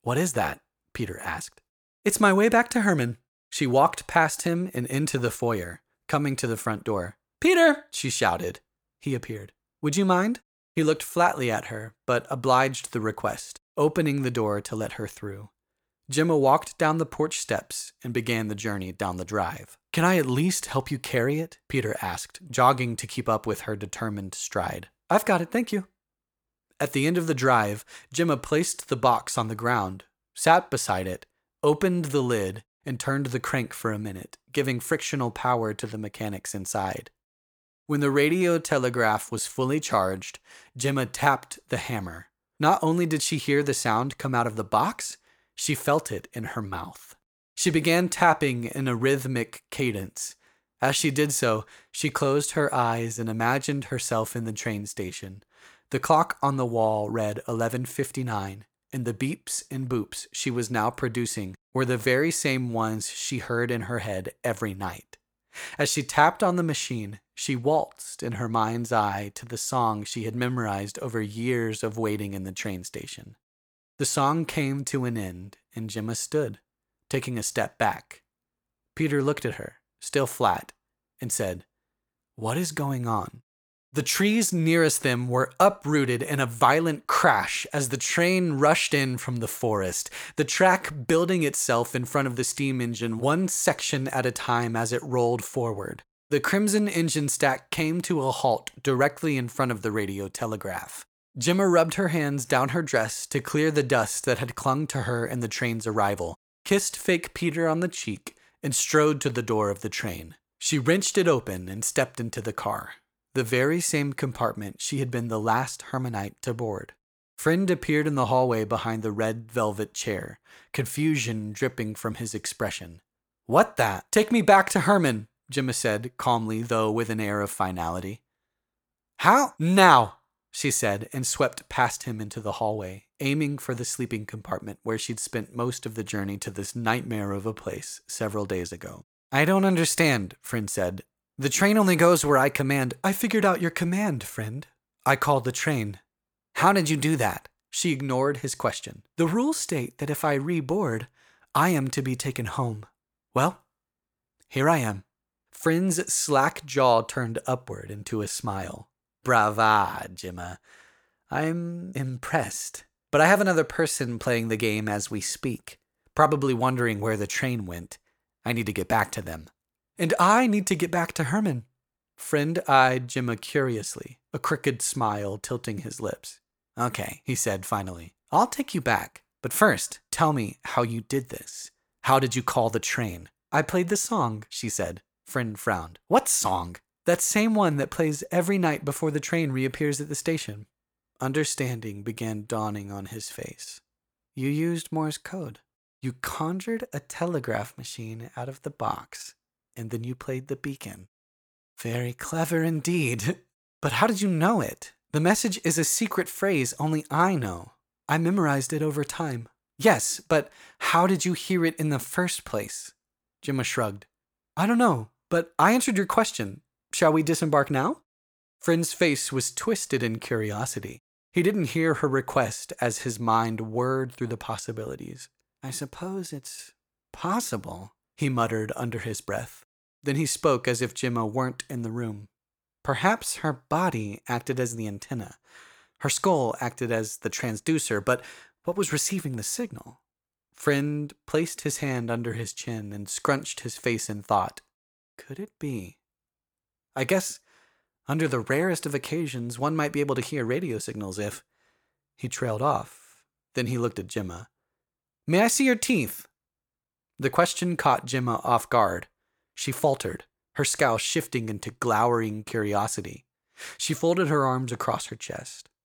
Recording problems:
none

